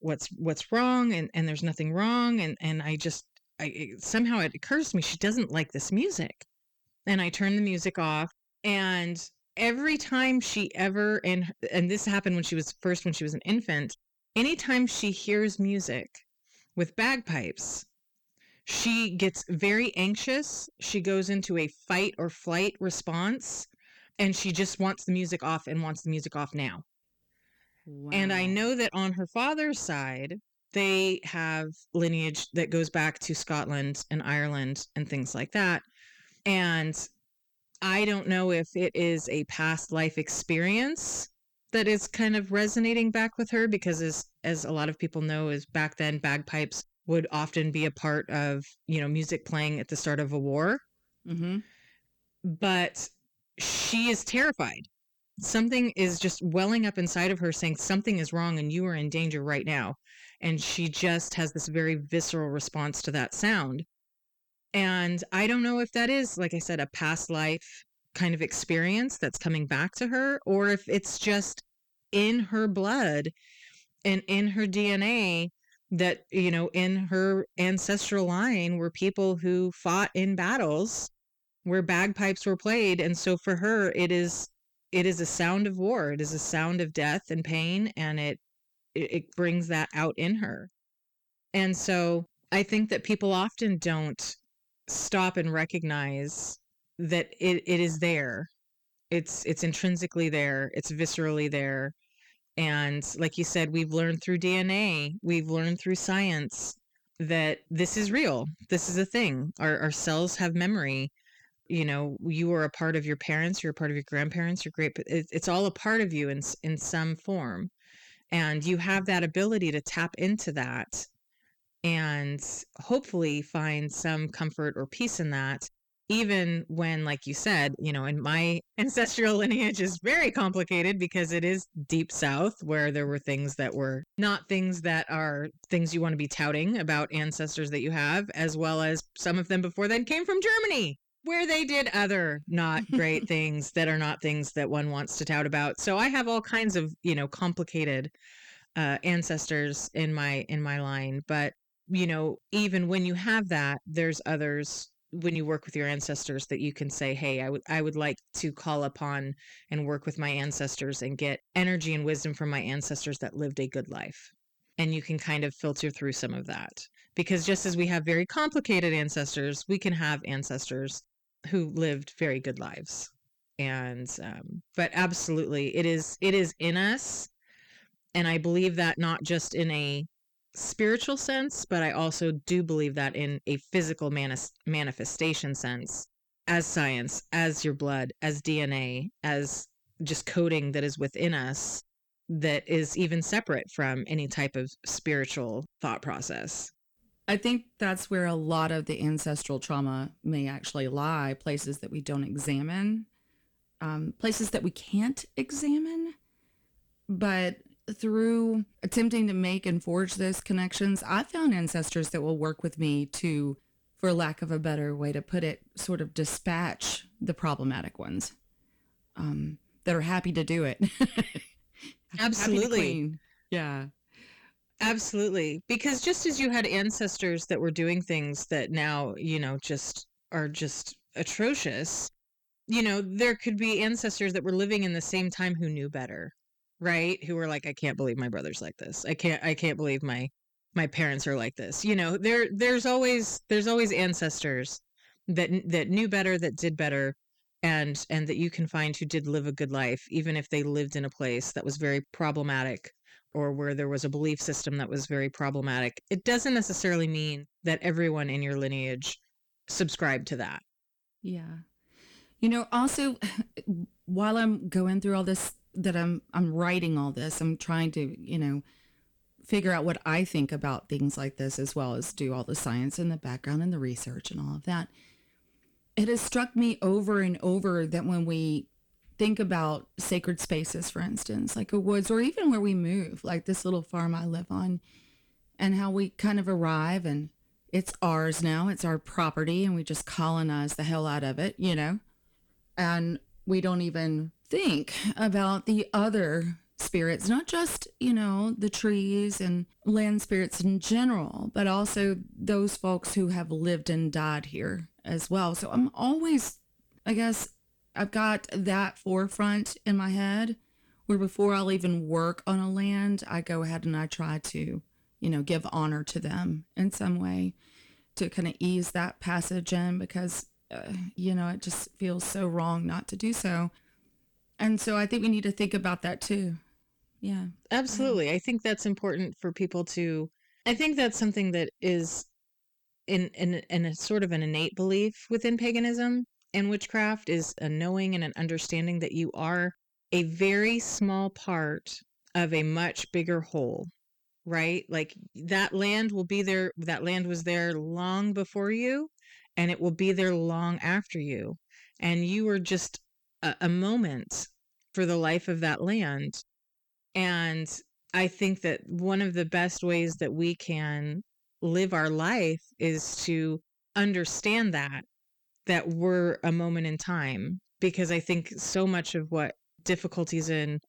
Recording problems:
distortion; slight; 10 dB below the speech

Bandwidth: 18.5 kHz